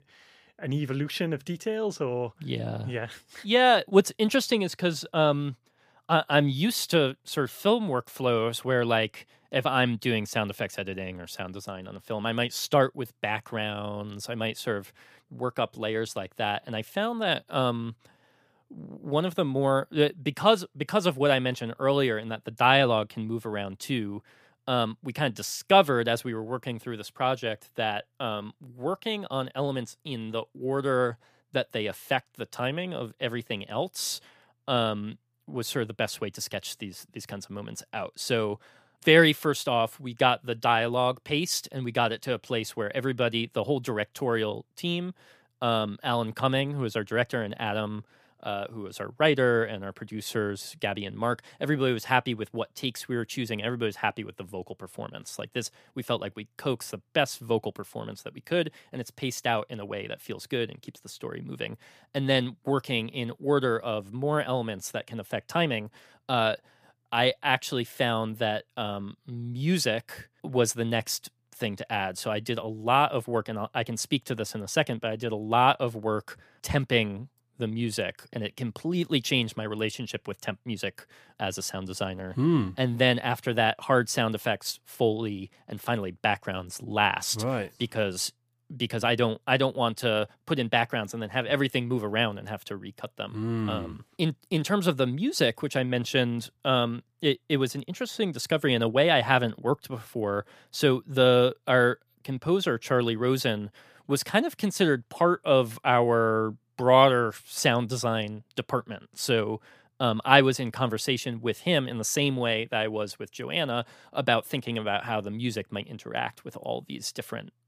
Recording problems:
none

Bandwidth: 15 kHz